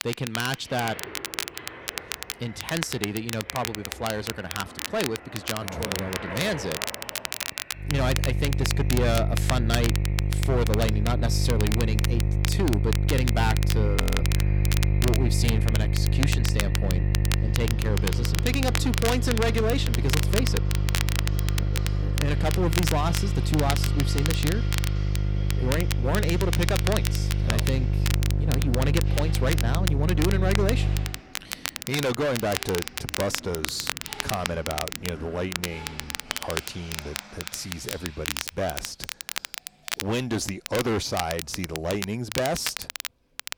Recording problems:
distortion; heavy; 7% of the sound clipped
electrical hum; loud; from 8 to 31 s; 50 Hz, 8 dB below the speech
crackle, like an old record; loud; 4 dB below the speech
household noises; noticeable; throughout; 15 dB below the speech
audio freezing; at 14 s

